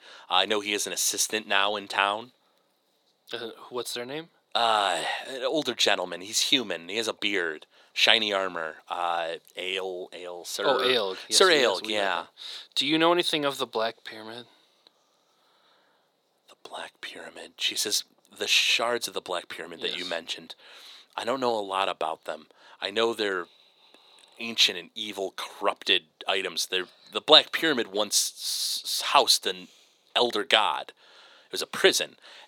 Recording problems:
thin; very; fading below 450 Hz

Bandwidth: 18.5 kHz